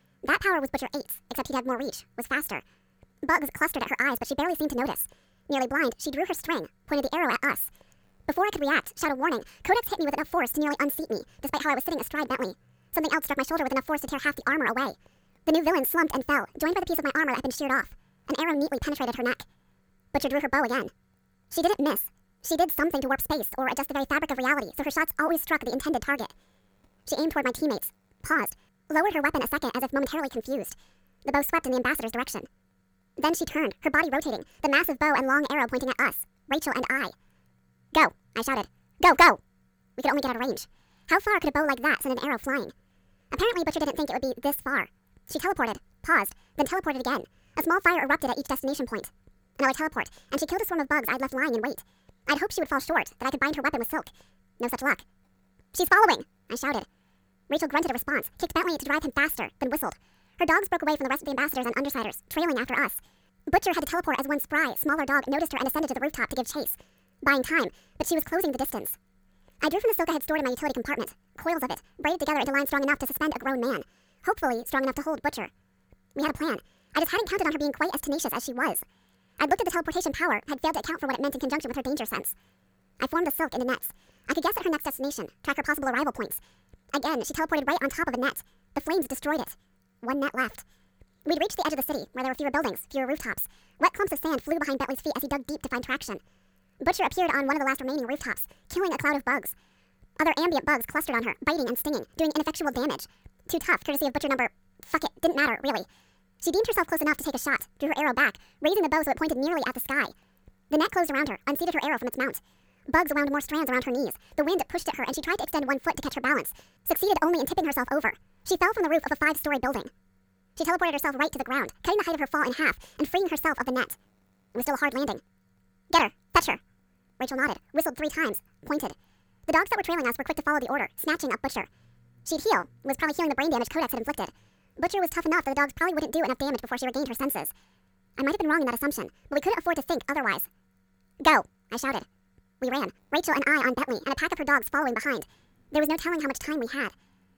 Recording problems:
wrong speed and pitch; too fast and too high; 1.6 times normal speed

